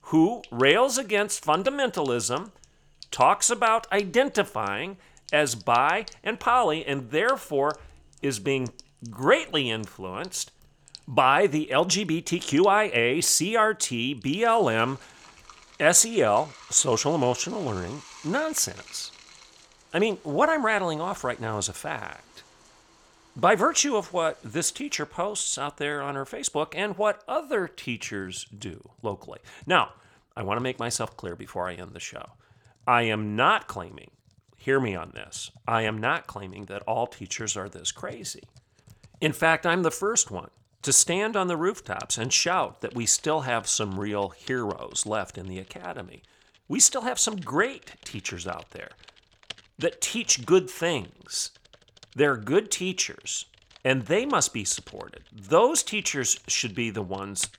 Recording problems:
household noises; faint; throughout; 25 dB below the speech

